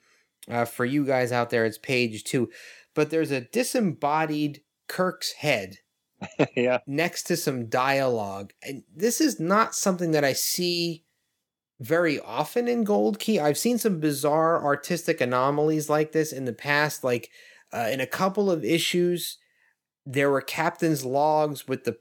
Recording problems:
none

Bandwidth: 18.5 kHz